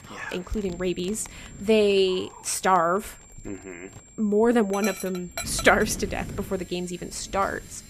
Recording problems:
animal sounds; noticeable; throughout; 15 dB below the speech
wind noise on the microphone; occasional gusts; 25 dB below the speech
high-pitched whine; faint; throughout; 7.5 kHz, 25 dB below the speech

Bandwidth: 14.5 kHz